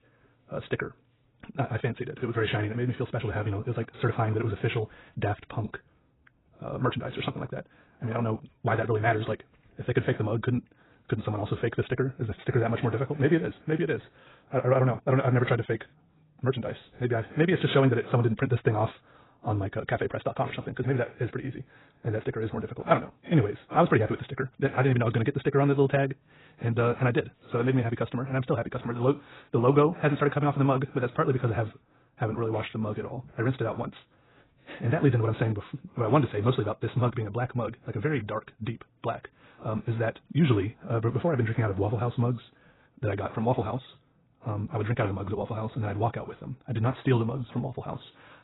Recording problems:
garbled, watery; badly; nothing above 4 kHz
wrong speed, natural pitch; too fast; 1.7 times normal speed

